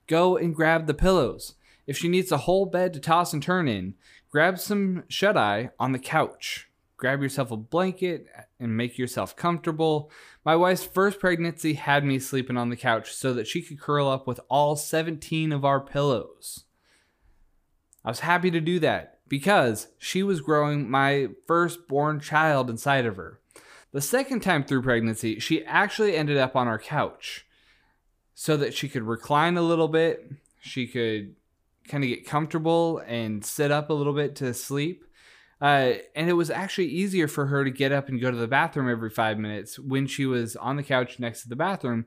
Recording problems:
none

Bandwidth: 15 kHz